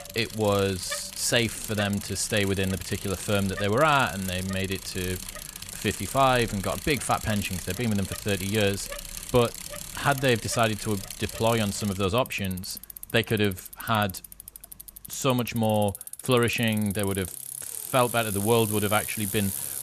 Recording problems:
traffic noise; loud; throughout; 10 dB below the speech

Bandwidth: 14 kHz